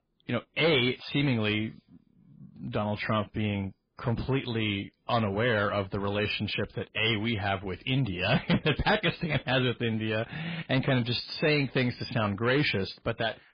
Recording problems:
distortion; heavy; 8 dB below the speech
garbled, watery; badly

